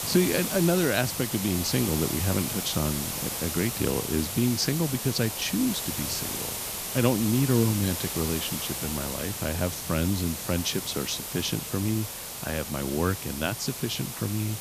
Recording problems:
hiss; loud; throughout; 3 dB below the speech

